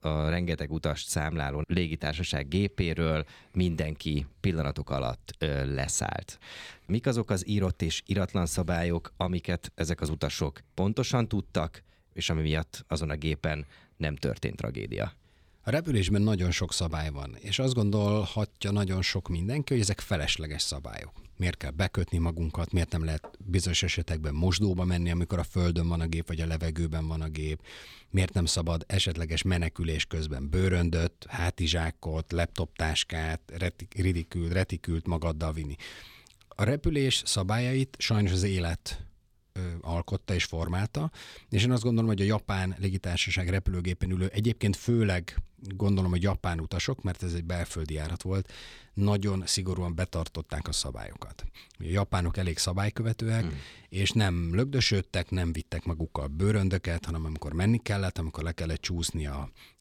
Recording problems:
none

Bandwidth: 17.5 kHz